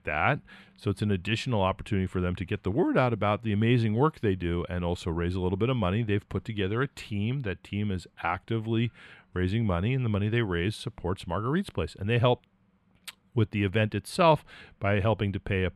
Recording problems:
muffled; slightly; fading above 3.5 kHz

